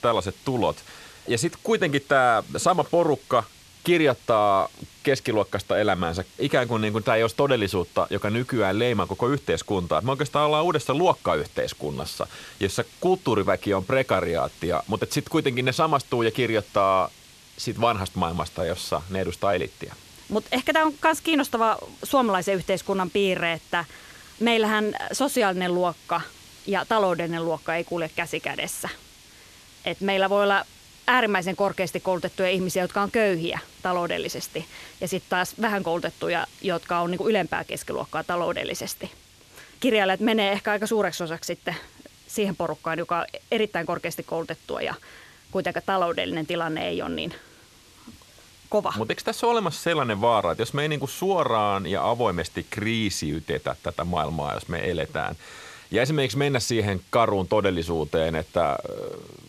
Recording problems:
hiss; faint; throughout; 25 dB below the speech

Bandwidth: 13.5 kHz